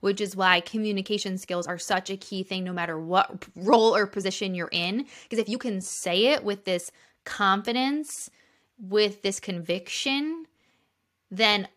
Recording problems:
uneven, jittery; strongly; from 0.5 to 10 s

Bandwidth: 14.5 kHz